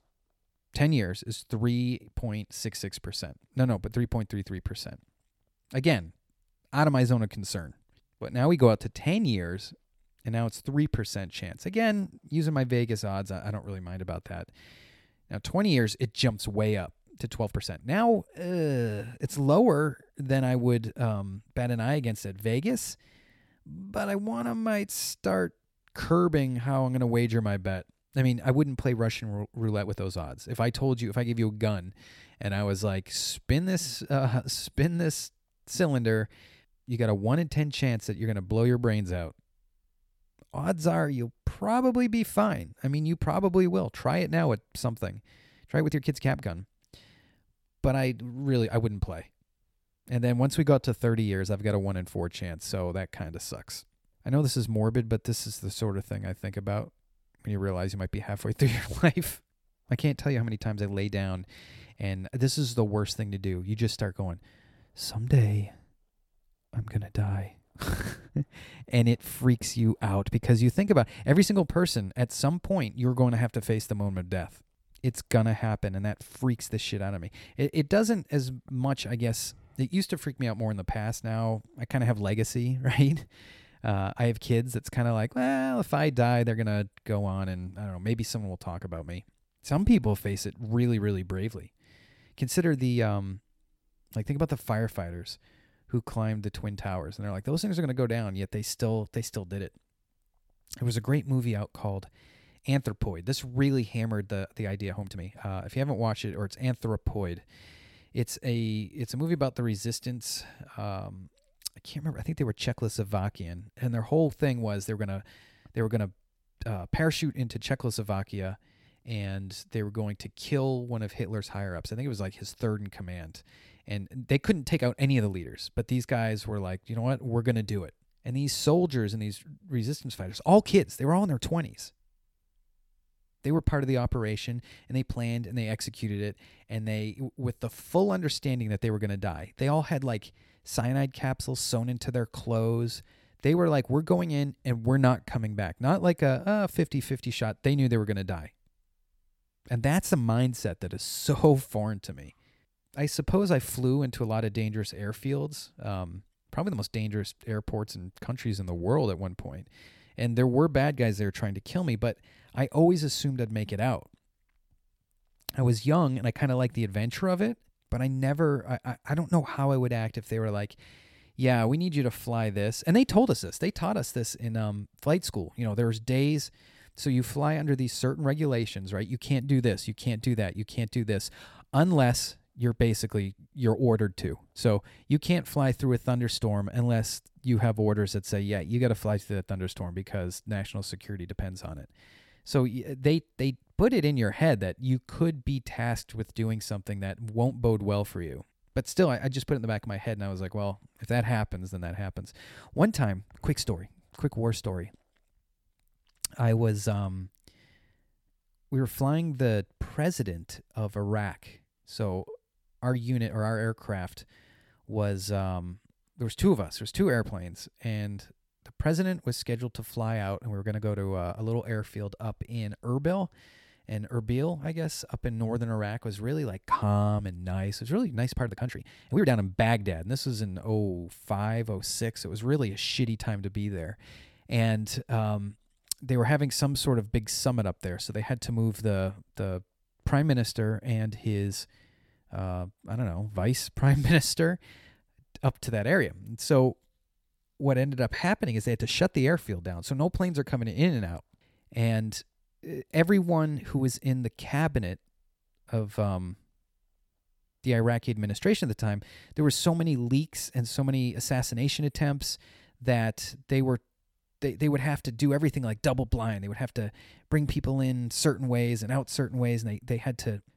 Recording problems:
uneven, jittery; strongly; from 17 s to 3:49

